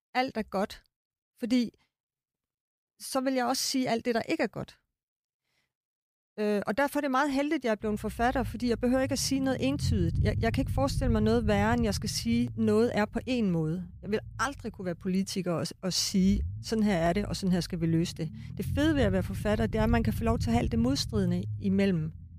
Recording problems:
low rumble; noticeable; from 8 s on; 20 dB below the speech

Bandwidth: 15 kHz